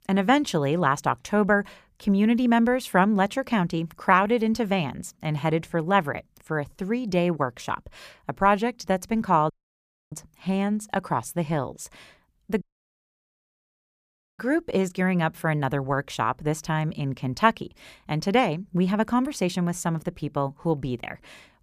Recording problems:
audio cutting out; at 9.5 s for 0.5 s and at 13 s for 2 s

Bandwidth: 15 kHz